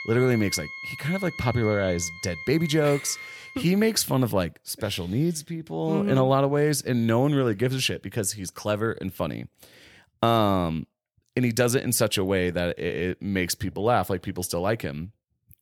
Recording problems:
background music; noticeable; until 3.5 s; 10 dB below the speech

